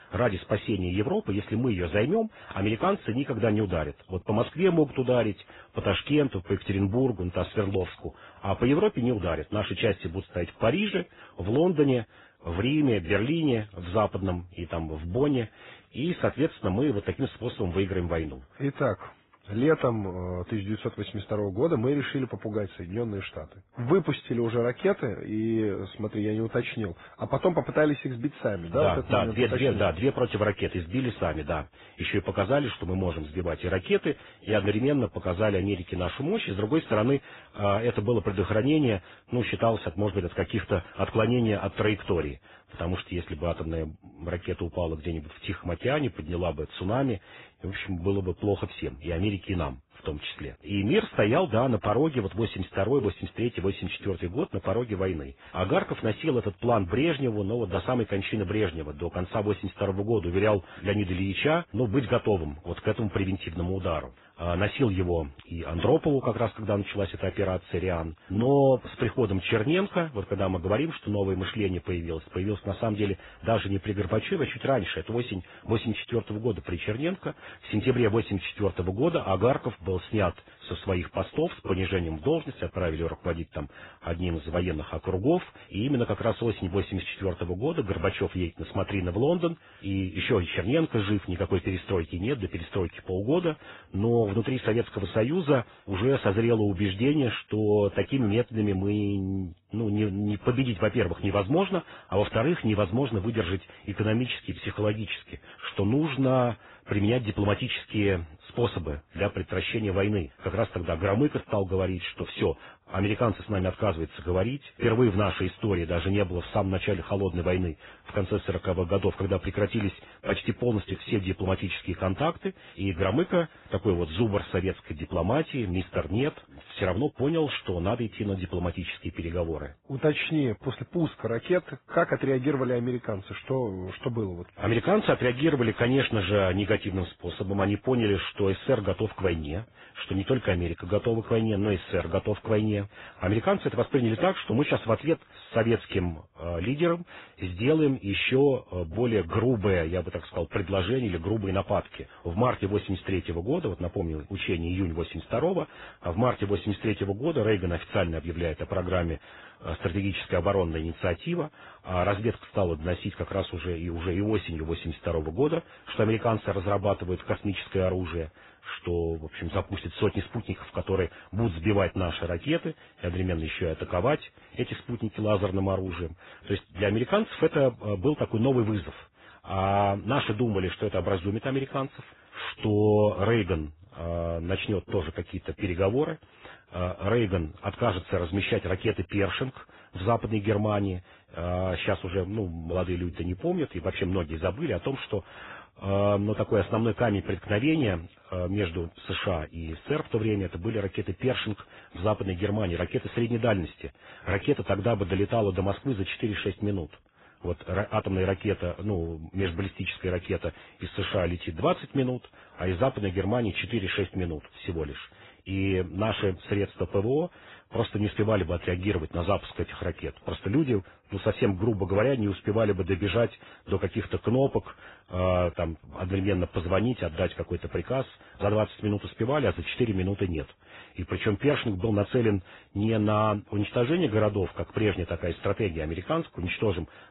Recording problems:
garbled, watery; badly; nothing above 4 kHz
muffled; very slightly; fading above 2.5 kHz

